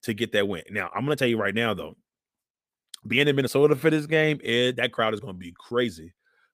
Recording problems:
uneven, jittery; strongly; from 0.5 to 6 s

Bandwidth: 15 kHz